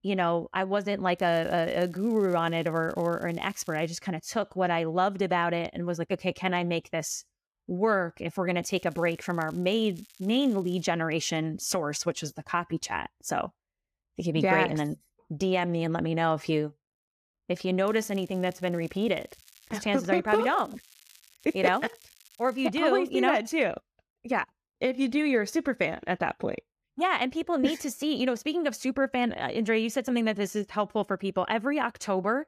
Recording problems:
crackling; faint; 4 times, first at 1 s; 25 dB below the speech

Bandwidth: 14.5 kHz